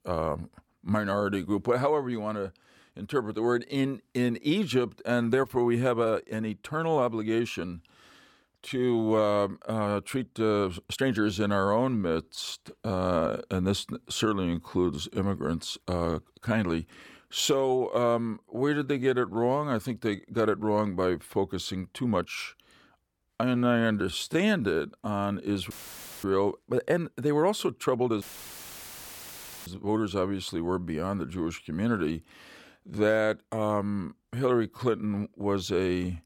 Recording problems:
uneven, jittery; strongly; from 3.5 to 35 s
audio cutting out; filled with static; at 26 s for 0.5 s and at 28 s for 1.5 s

